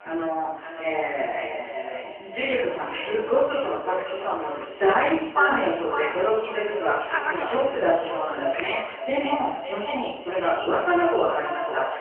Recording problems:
phone-call audio; poor line; nothing above 3 kHz
echo of what is said; strong; throughout; 560 ms later, 7 dB below the speech
off-mic speech; far
room echo; noticeable; dies away in 0.6 s
hiss; loud; from 1.5 to 5 s and from 6.5 to 9.5 s; 8 dB below the speech
voice in the background; faint; throughout; 20 dB below the speech

